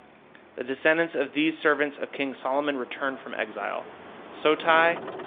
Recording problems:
phone-call audio; nothing above 3.5 kHz
traffic noise; noticeable; throughout; 20 dB below the speech

